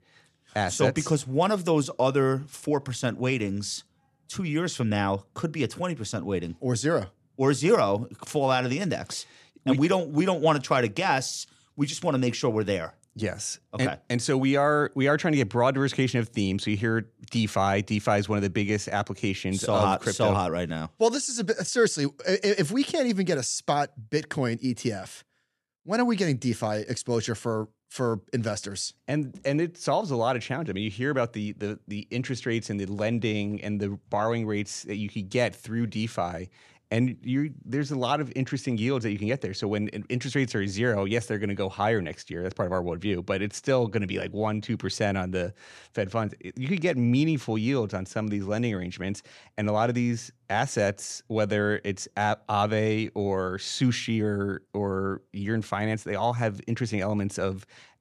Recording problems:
none

